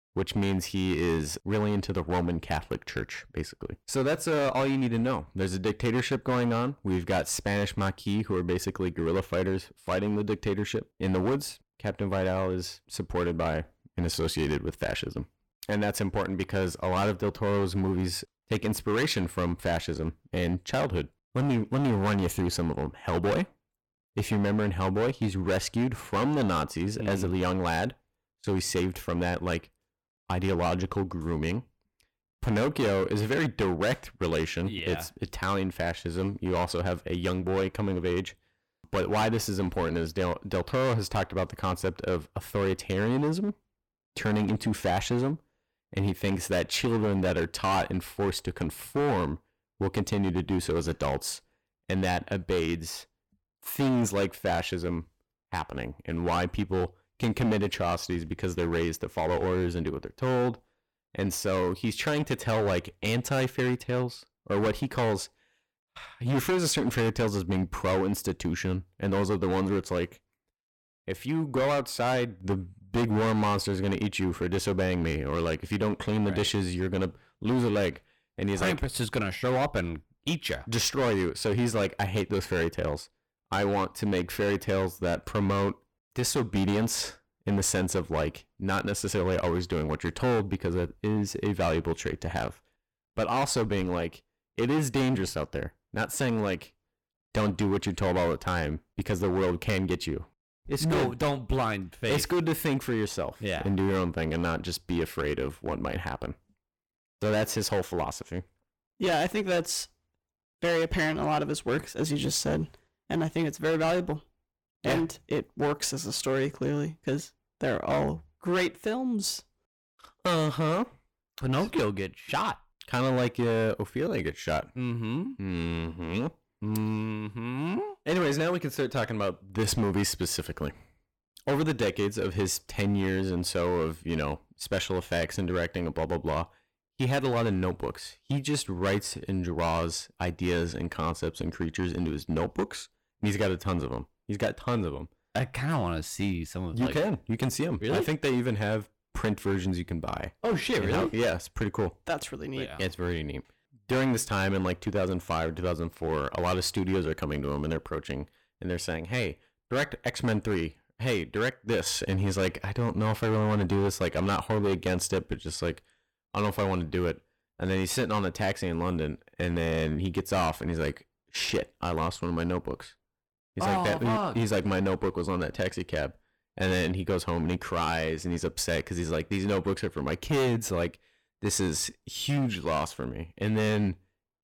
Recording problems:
distortion; heavy; 11% of the sound clipped

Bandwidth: 18 kHz